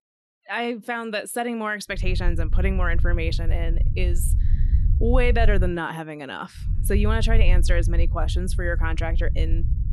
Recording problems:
low rumble; noticeable; from 2 to 5.5 s and from 6.5 s on; 15 dB below the speech

